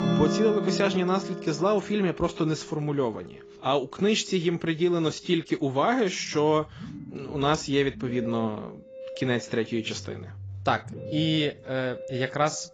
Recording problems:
garbled, watery; badly; nothing above 7.5 kHz
background music; loud; throughout; 9 dB below the speech

